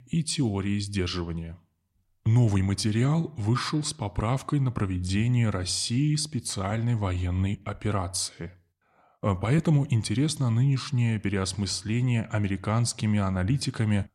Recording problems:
none

